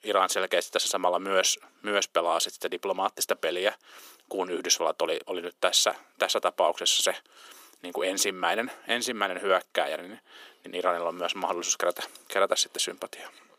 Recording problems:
thin; very; fading below 400 Hz

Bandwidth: 15 kHz